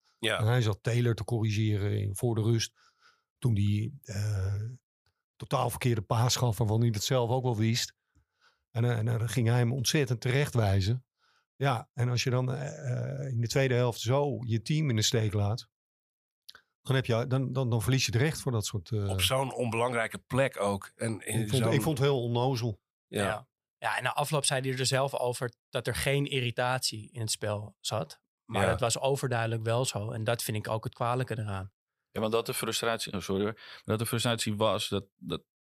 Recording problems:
none

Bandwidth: 15 kHz